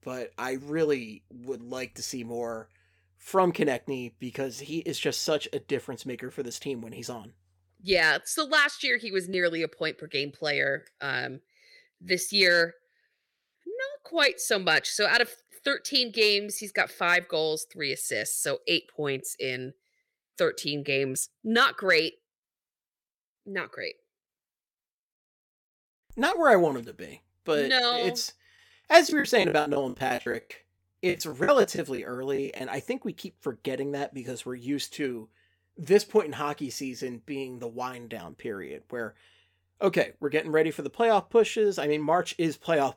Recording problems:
choppy; very; from 29 to 33 s; 19% of the speech affected

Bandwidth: 17.5 kHz